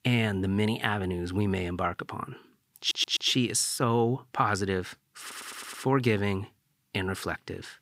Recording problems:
audio stuttering; at 3 s and at 5 s

